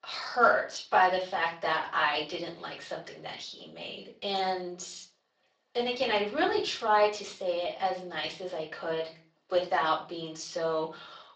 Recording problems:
off-mic speech; far
thin; very; fading below 650 Hz
room echo; slight; dies away in 0.3 s
garbled, watery; slightly; nothing above 7.5 kHz

